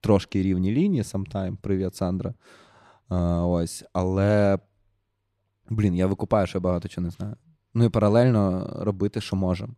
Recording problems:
none

